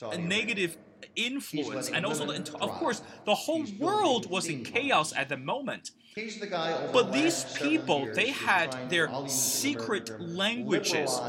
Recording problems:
voice in the background; loud; throughout; 8 dB below the speech

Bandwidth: 16.5 kHz